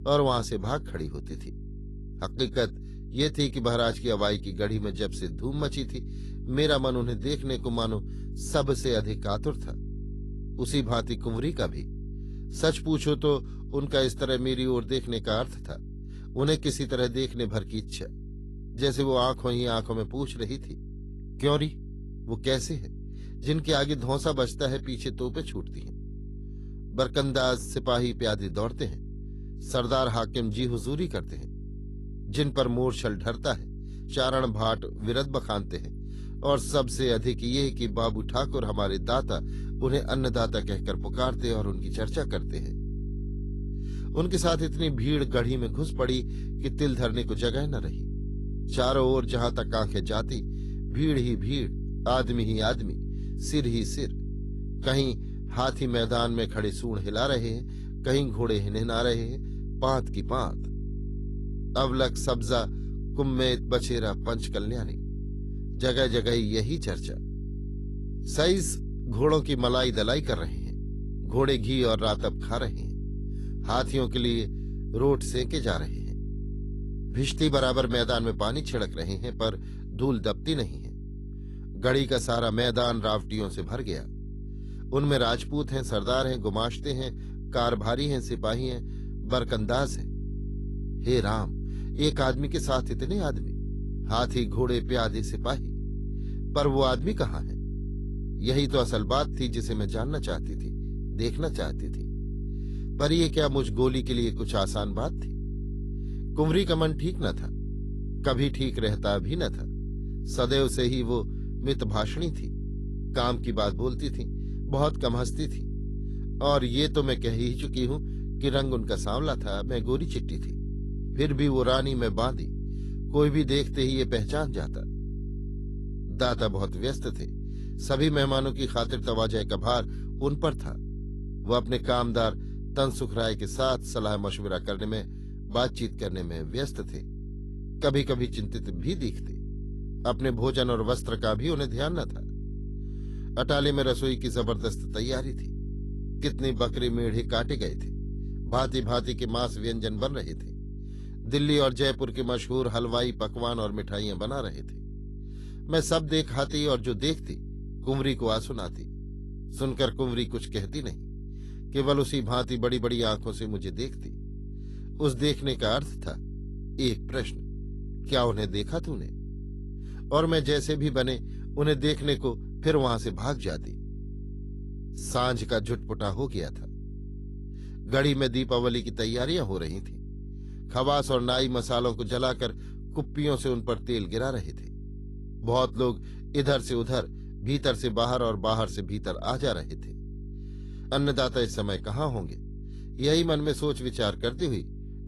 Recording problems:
garbled, watery; slightly; nothing above 11.5 kHz
electrical hum; noticeable; throughout; 50 Hz, 20 dB below the speech

